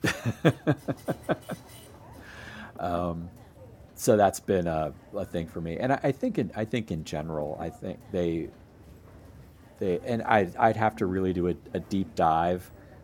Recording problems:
machinery noise; faint; throughout; 20 dB below the speech

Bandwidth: 17 kHz